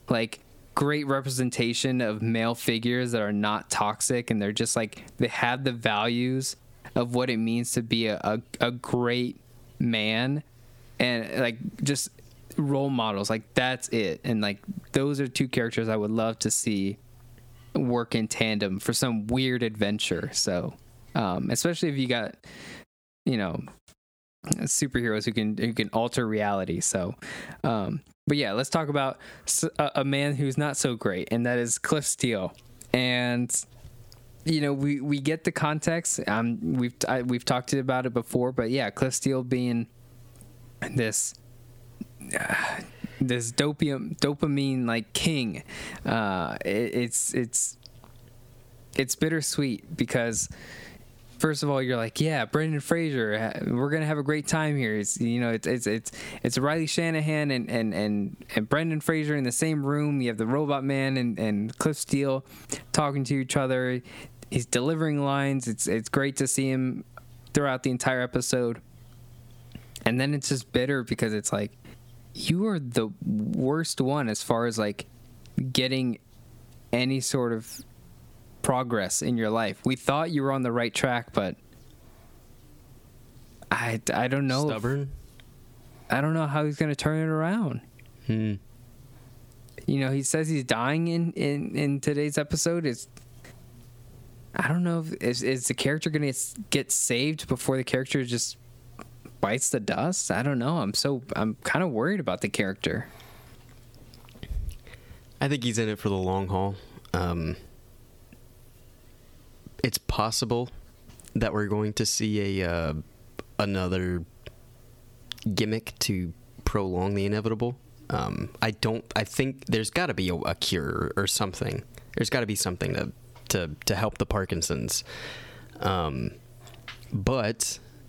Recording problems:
squashed, flat; heavily

